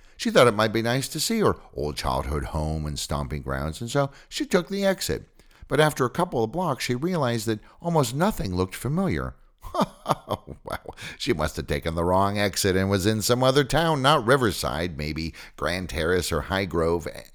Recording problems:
none

